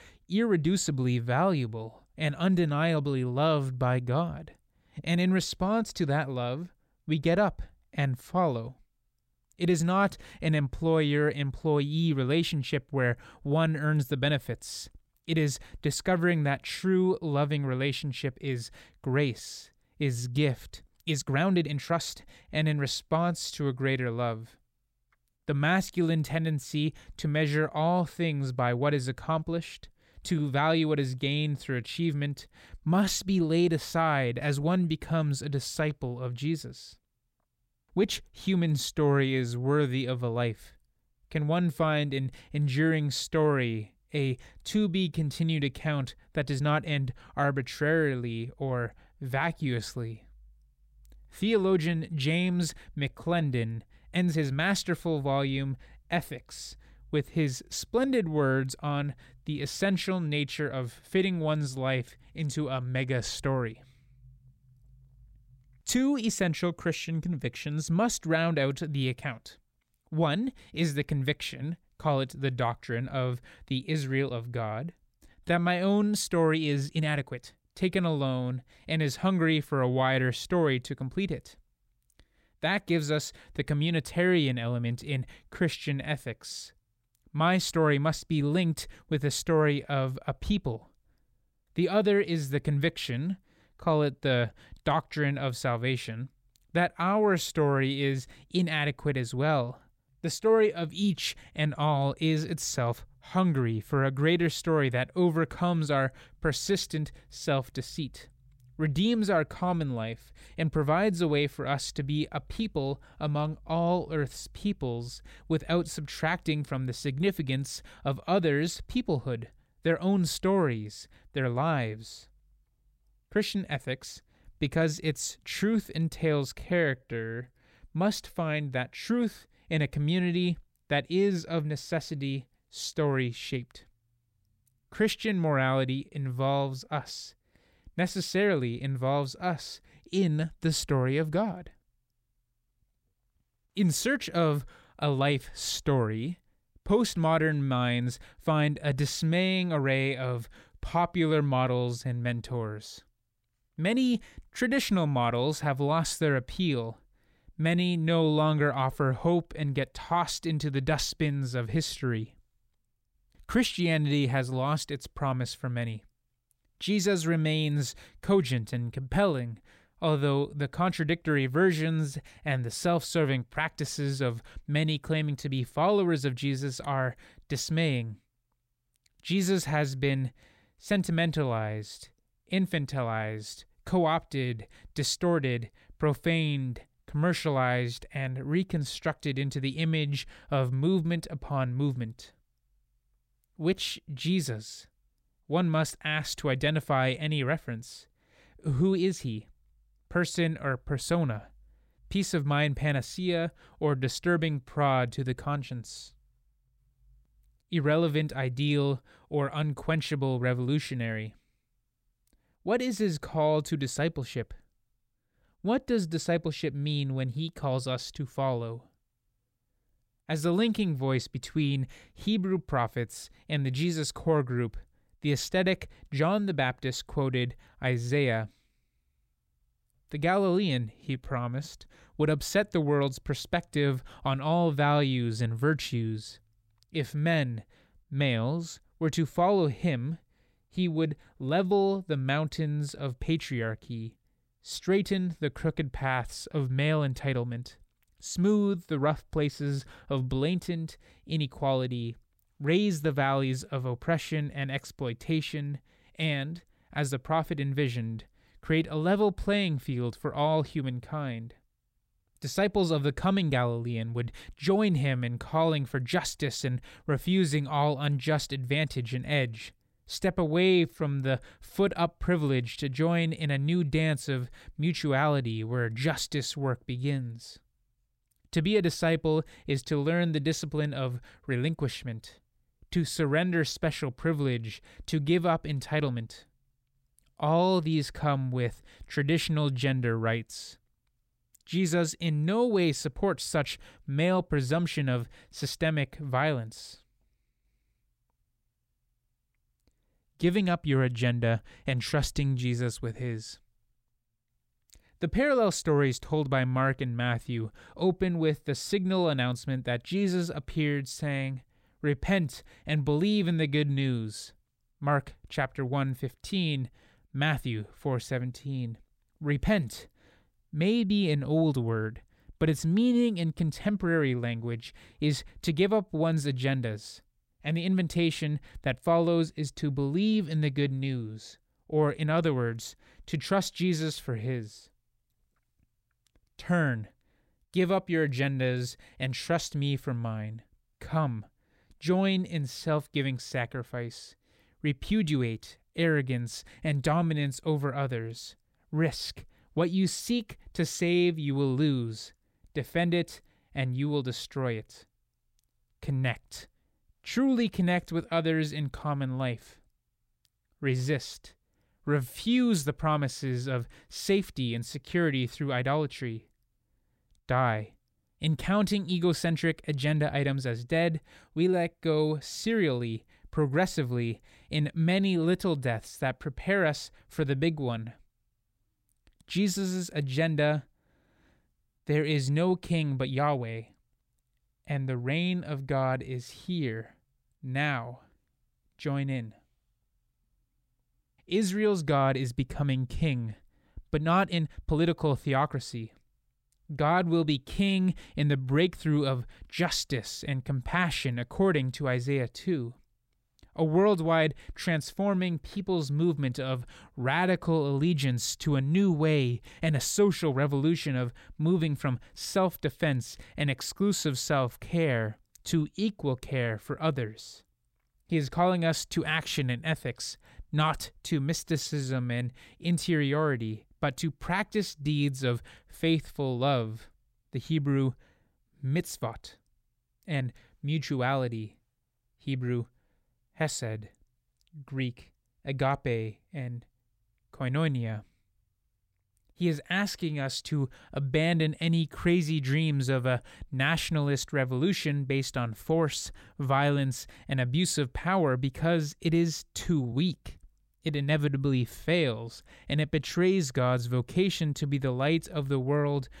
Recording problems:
uneven, jittery; strongly; from 21 s to 7:30

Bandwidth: 16 kHz